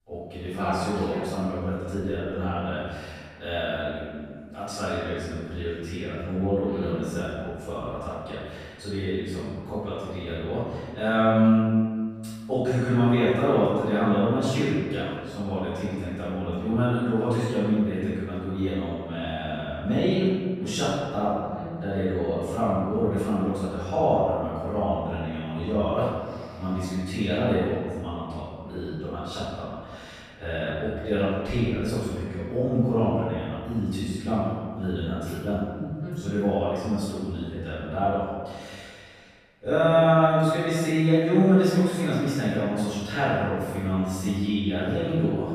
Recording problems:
room echo; strong; dies away in 1.6 s
off-mic speech; far

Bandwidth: 14.5 kHz